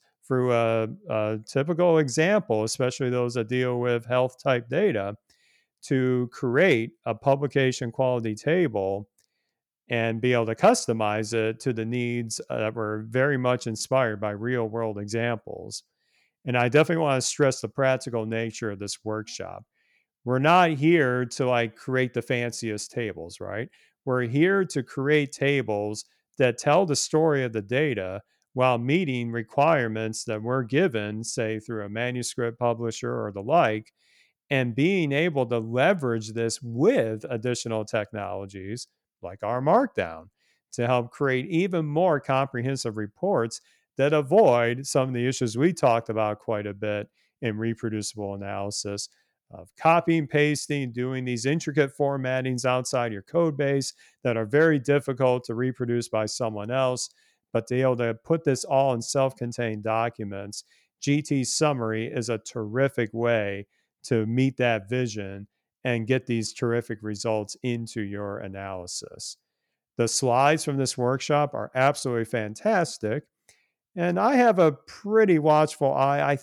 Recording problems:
none

